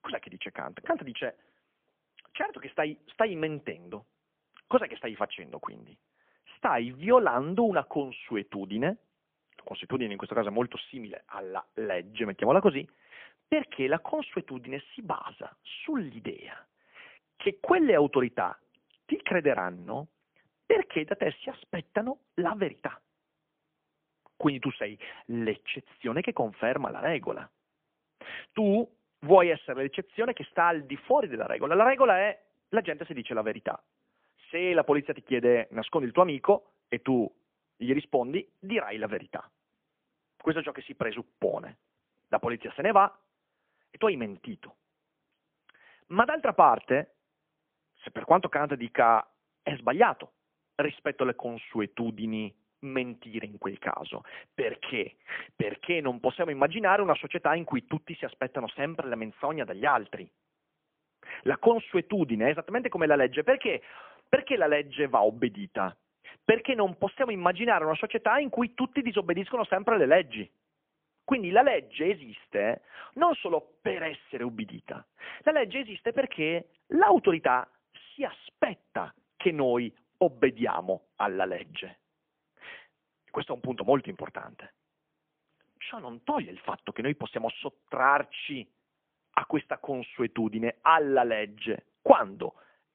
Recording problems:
phone-call audio; poor line; nothing above 3.5 kHz

